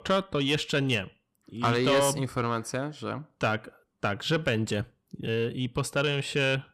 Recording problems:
distortion; slight; 10 dB below the speech

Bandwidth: 14.5 kHz